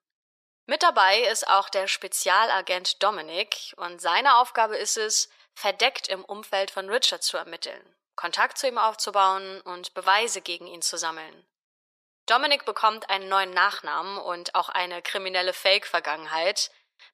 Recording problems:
thin; very; fading below 600 Hz

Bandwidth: 14.5 kHz